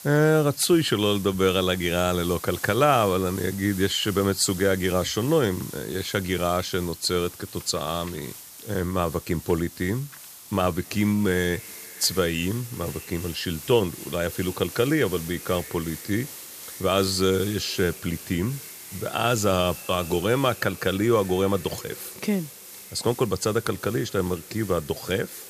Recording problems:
echo of what is said; faint; from 11 s on; 240 ms later, 25 dB below the speech
hiss; noticeable; throughout; 15 dB below the speech

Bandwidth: 14.5 kHz